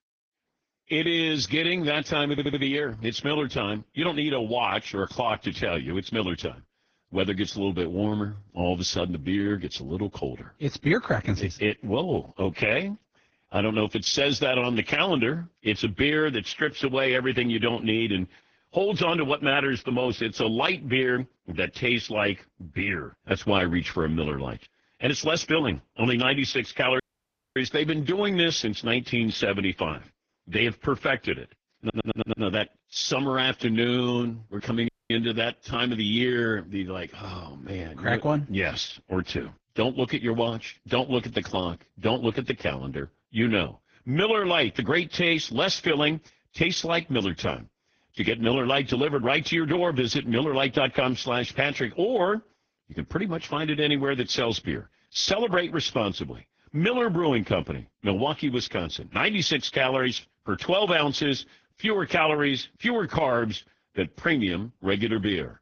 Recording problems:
garbled, watery; badly; nothing above 6.5 kHz
audio stuttering; at 2.5 s and at 32 s
audio cutting out; at 27 s for 0.5 s and at 35 s

